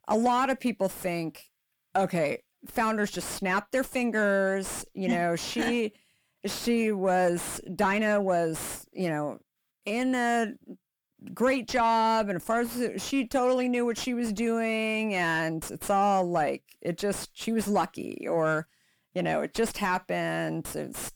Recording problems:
distortion; slight; 10 dB below the speech

